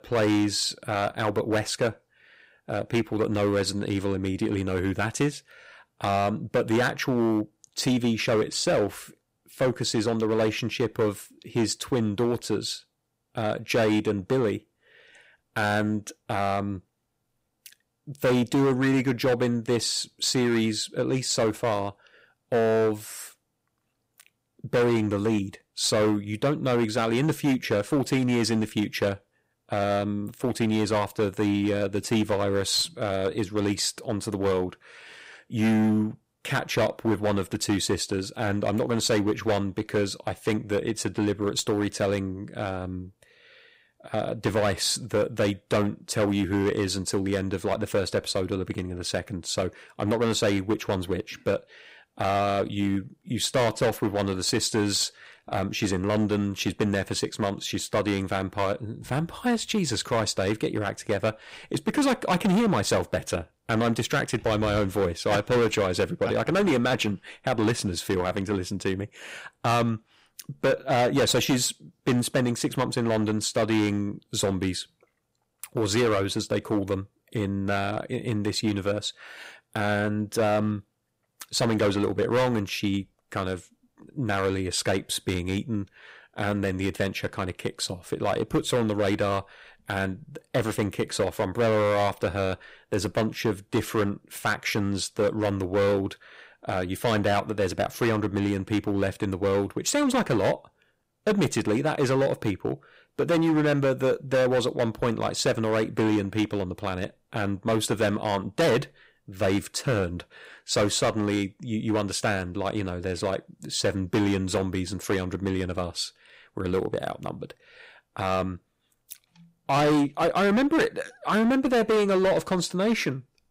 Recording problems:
distortion; heavy; 8% of the sound clipped

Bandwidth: 15.5 kHz